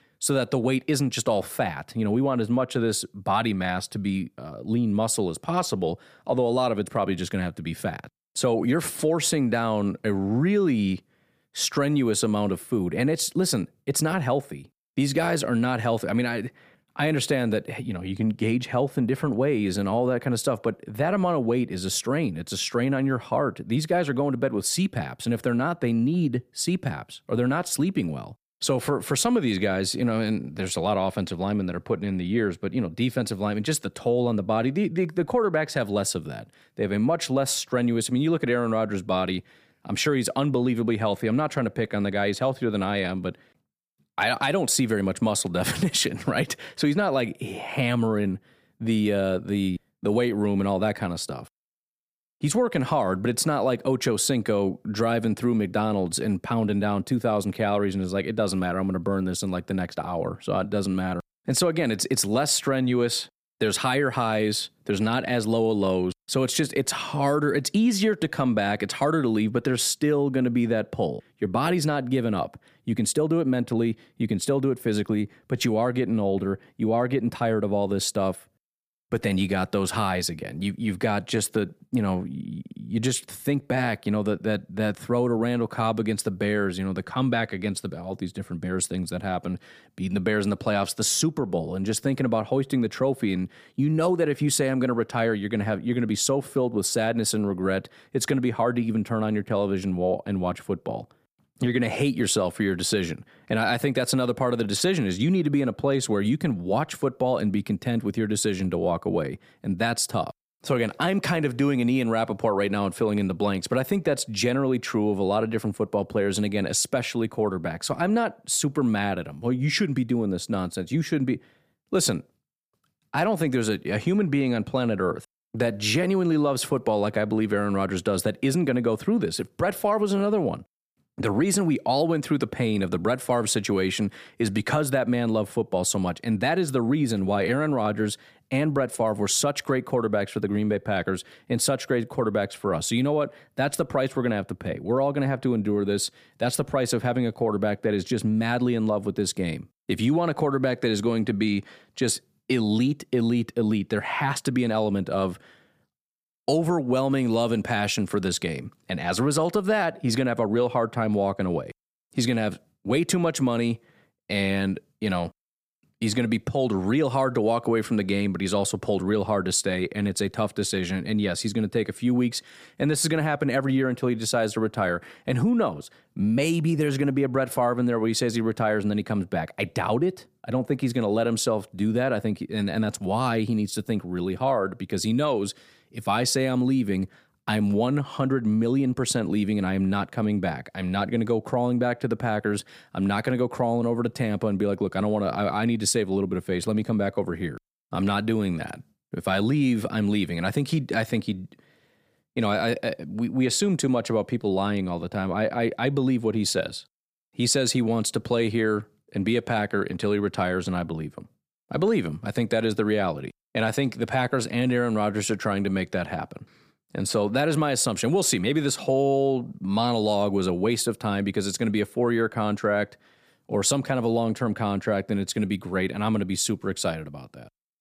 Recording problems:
none

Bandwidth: 15 kHz